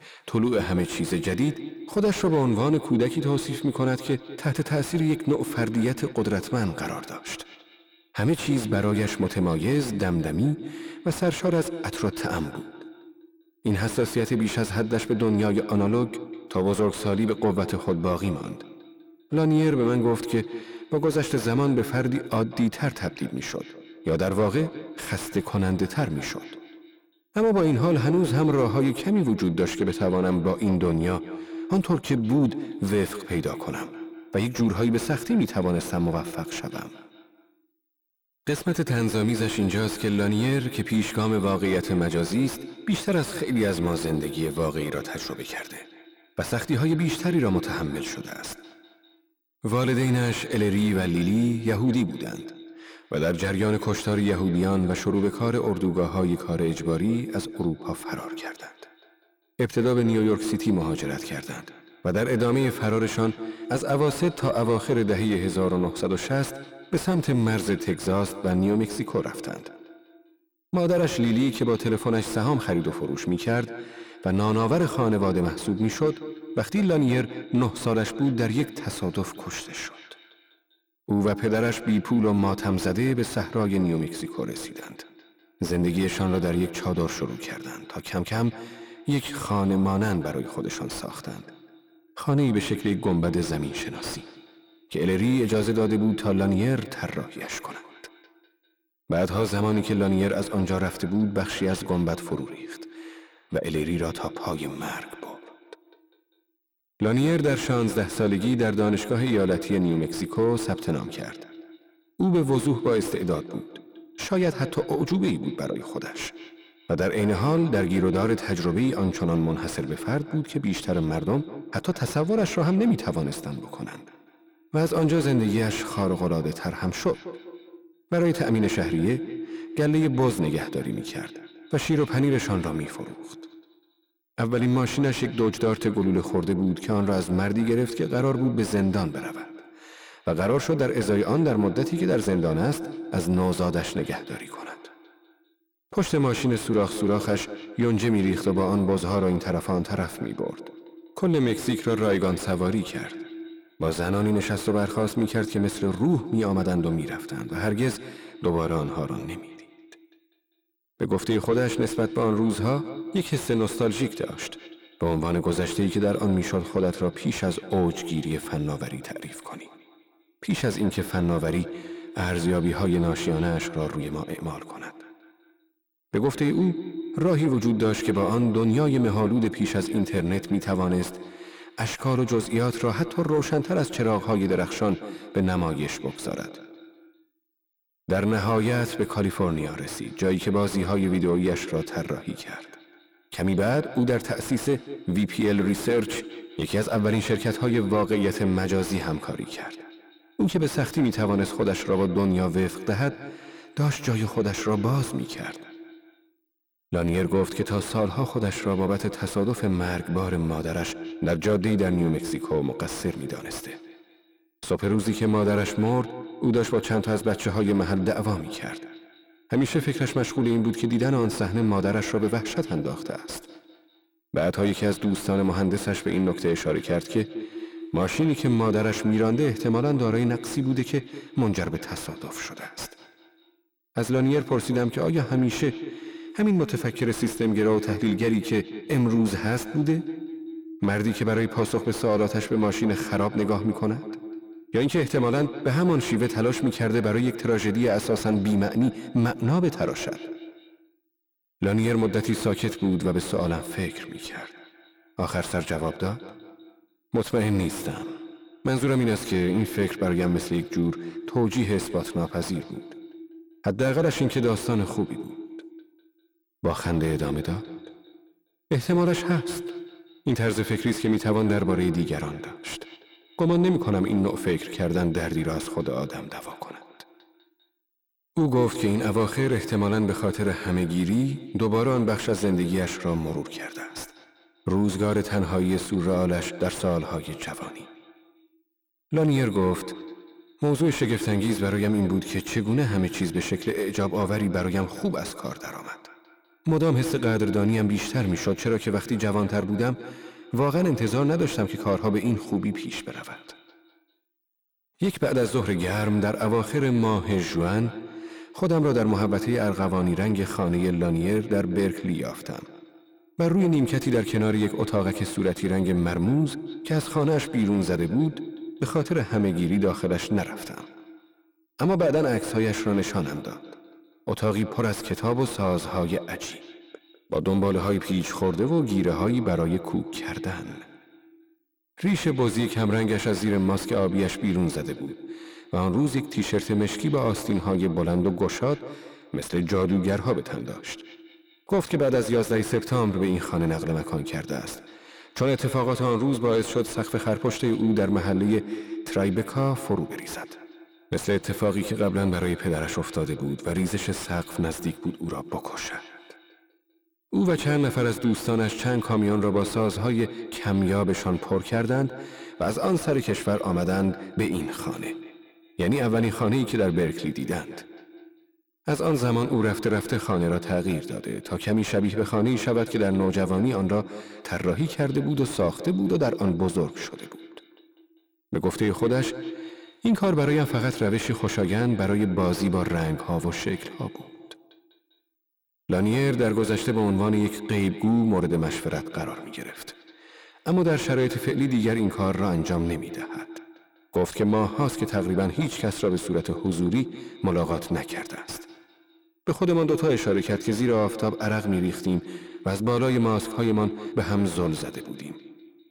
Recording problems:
echo of what is said; strong; throughout; 200 ms later, 10 dB below the speech
distortion; slight; 10 dB below the speech

